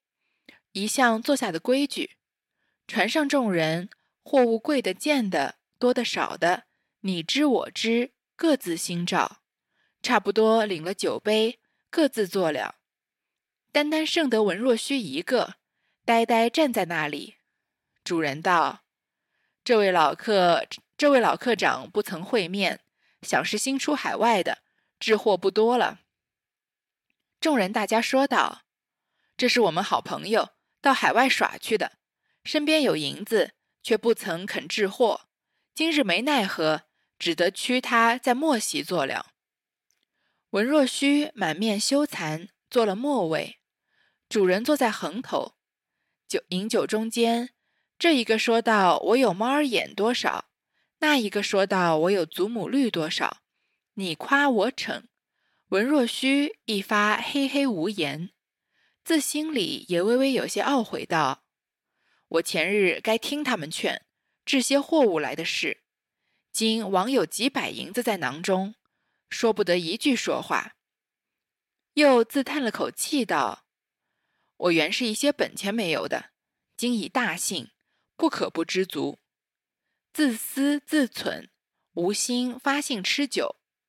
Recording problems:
thin; very slightly; fading below 500 Hz

